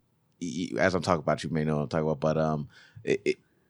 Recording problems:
none

